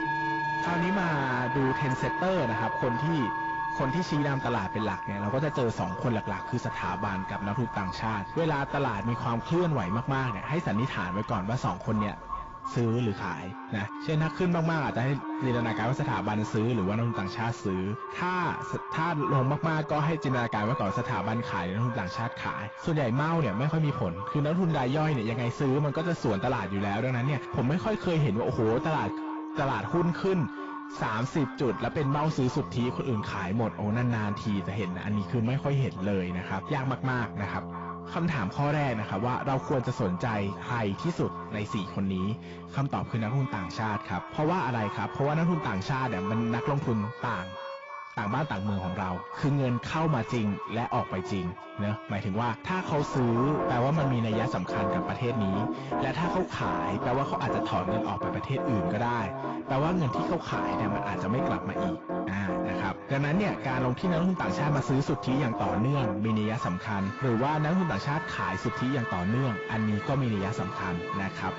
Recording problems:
distortion; heavy; 7 dB below the speech
echo of what is said; strong; throughout; 320 ms later, 10 dB below the speech
garbled, watery; badly; nothing above 7.5 kHz
background music; loud; throughout; 7 dB below the speech

